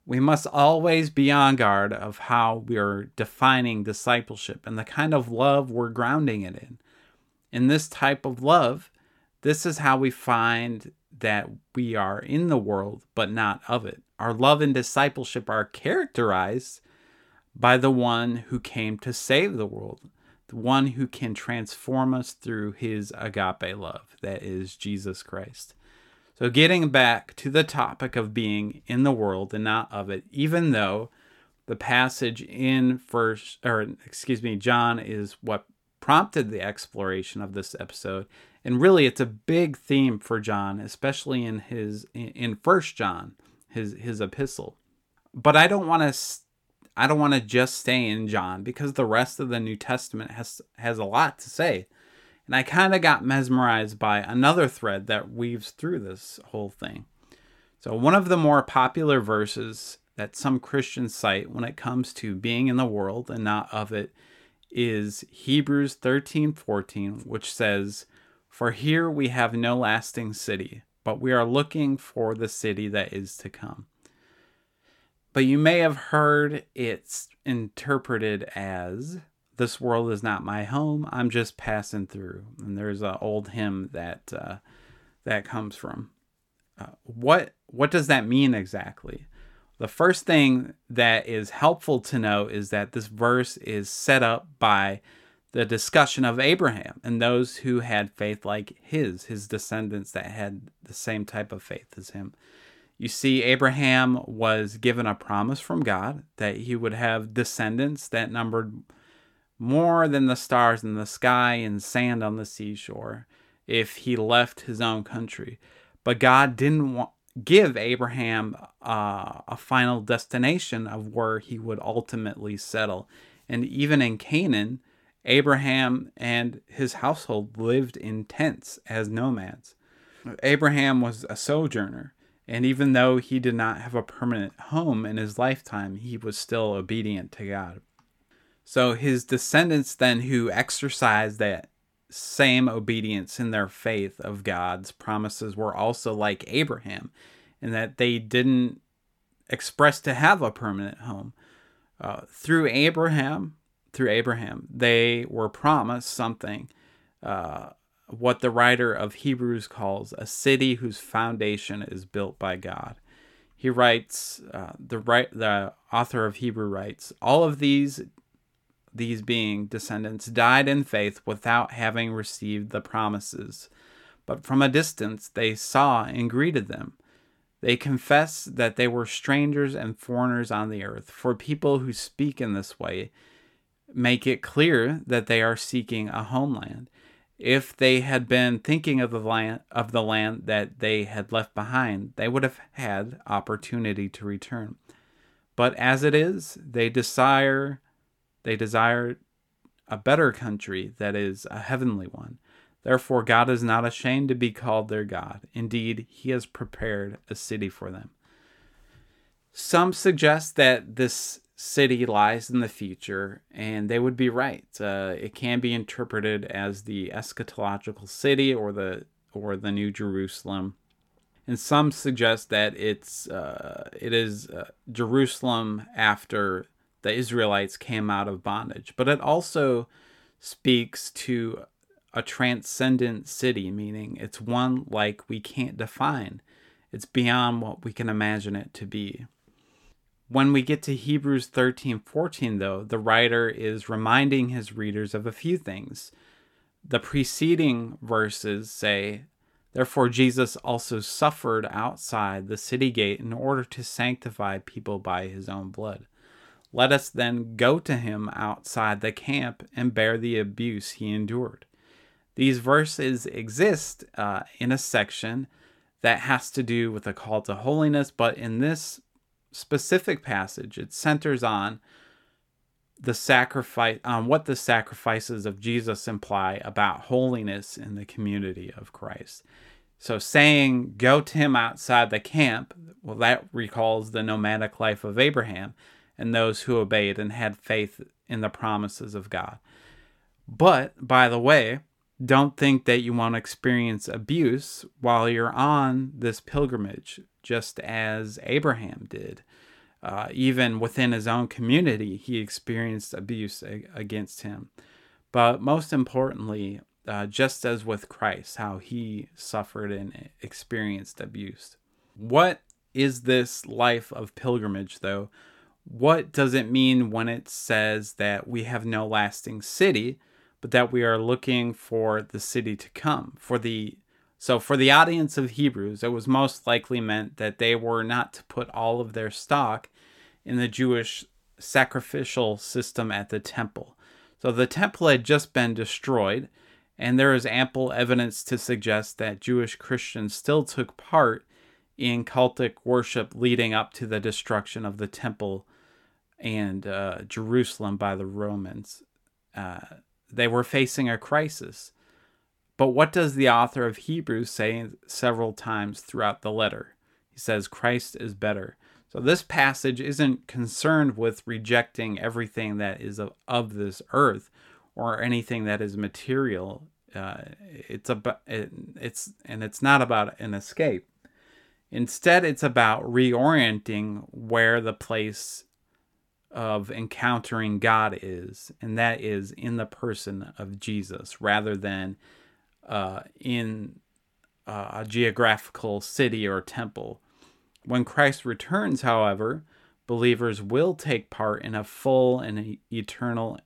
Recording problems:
none

